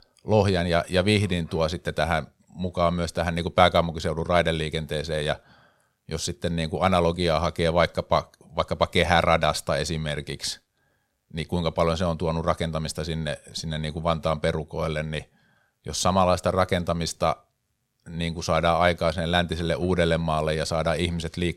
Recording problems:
none

